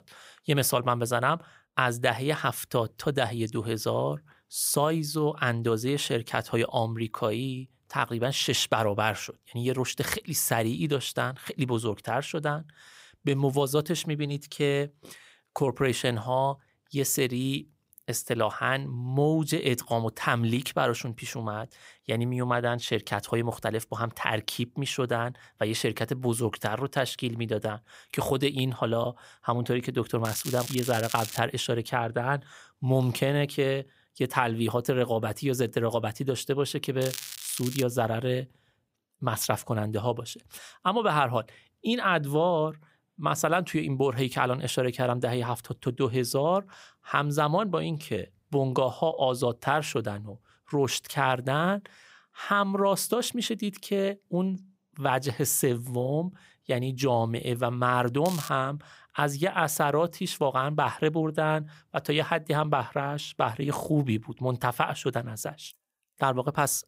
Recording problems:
crackling; loud; from 30 to 31 s, at 37 s and at 58 s; 9 dB below the speech

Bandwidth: 15.5 kHz